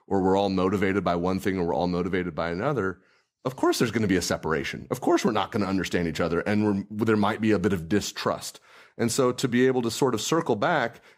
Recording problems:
none

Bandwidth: 15.5 kHz